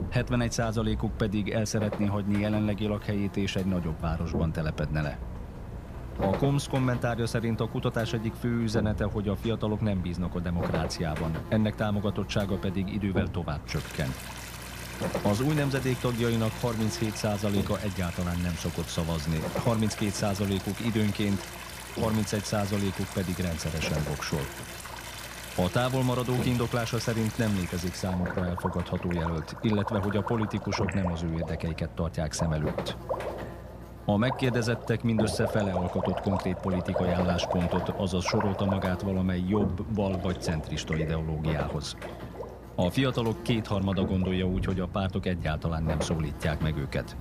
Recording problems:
electrical hum; loud; throughout; 60 Hz, 10 dB below the speech
rain or running water; loud; throughout; 9 dB below the speech

